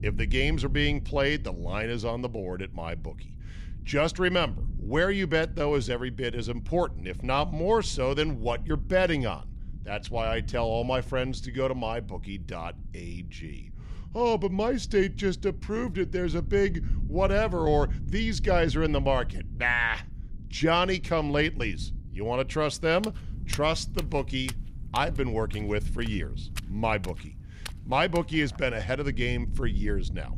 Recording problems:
low rumble; faint; throughout; 25 dB below the speech
footsteps; faint; from 23 to 29 s; peak 10 dB below the speech

